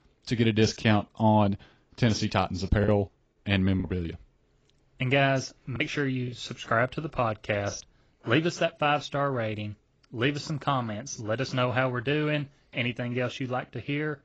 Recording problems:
garbled, watery; badly
choppy; occasionally; 2% of the speech affected

